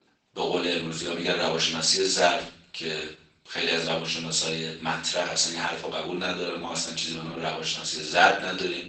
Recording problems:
off-mic speech; far
garbled, watery; badly; nothing above 8 kHz
room echo; noticeable; dies away in 0.5 s
thin; somewhat; fading below 400 Hz

